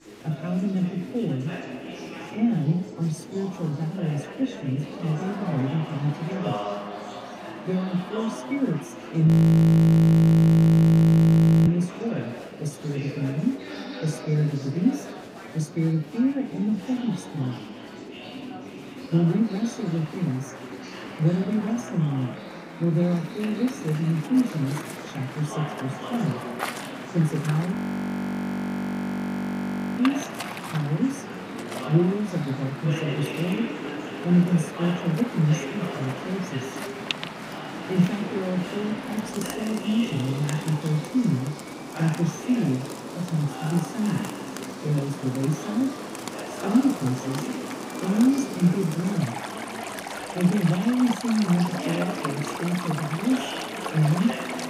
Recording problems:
off-mic speech; far
room echo; slight; dies away in 0.3 s
rain or running water; noticeable; from 23 s on; 10 dB below the speech
chatter from many people; noticeable; throughout; 10 dB below the speech
audio freezing; at 9.5 s for 2.5 s and at 28 s for 2 s

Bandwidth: 15.5 kHz